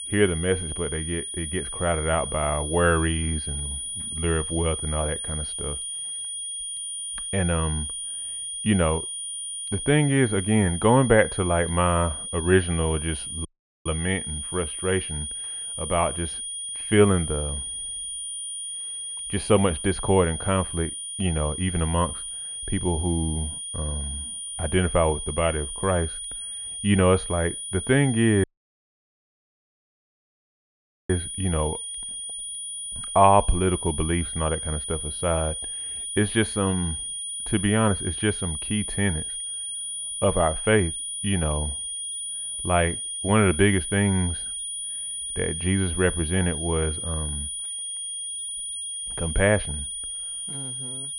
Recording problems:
muffled; very; fading above 2.5 kHz
high-pitched whine; loud; throughout; 9.5 kHz, 5 dB below the speech
audio cutting out; at 13 s and at 28 s for 2.5 s

